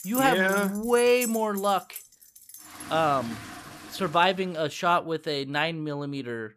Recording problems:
household noises; noticeable; until 4 s; 15 dB below the speech

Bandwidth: 14.5 kHz